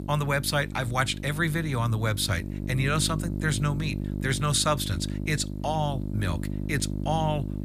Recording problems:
electrical hum; noticeable; throughout; 50 Hz, 15 dB below the speech

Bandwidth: 14.5 kHz